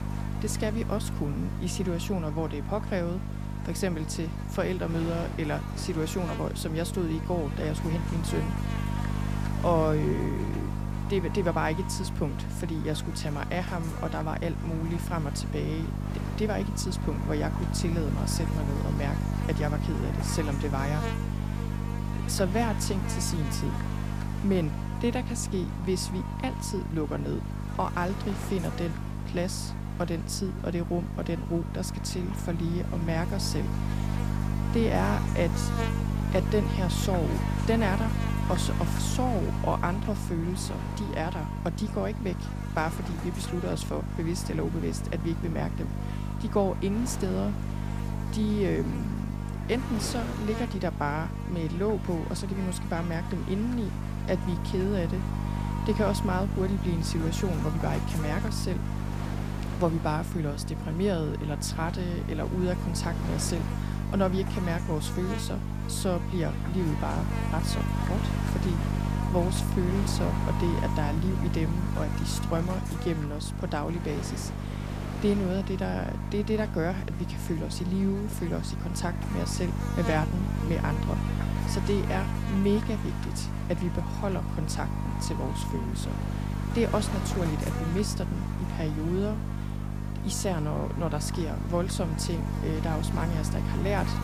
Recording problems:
electrical hum; loud; throughout; 50 Hz, 5 dB below the speech
wind noise on the microphone; occasional gusts; 15 dB below the speech

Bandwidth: 15 kHz